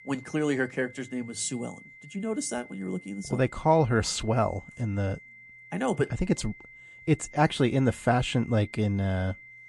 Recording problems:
garbled, watery; slightly
high-pitched whine; noticeable; throughout; 2 kHz, 20 dB below the speech

